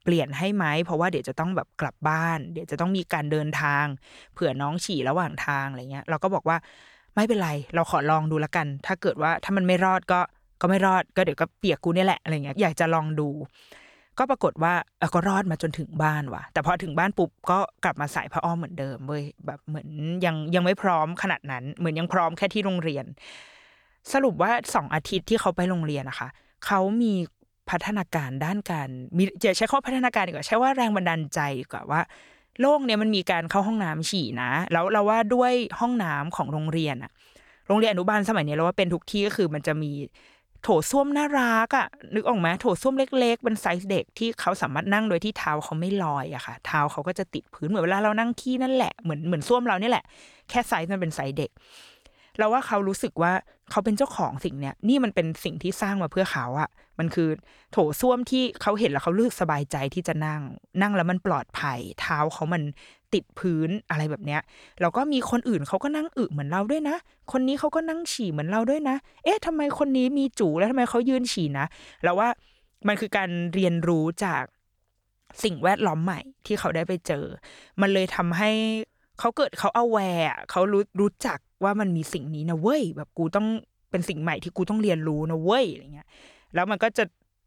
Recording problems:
none

